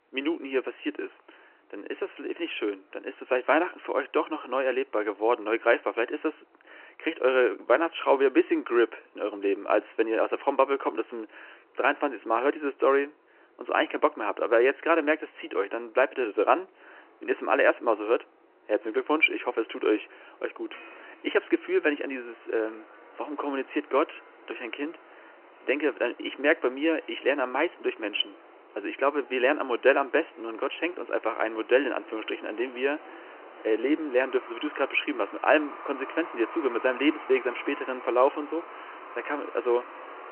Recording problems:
phone-call audio; nothing above 3 kHz
traffic noise; noticeable; throughout; 20 dB below the speech

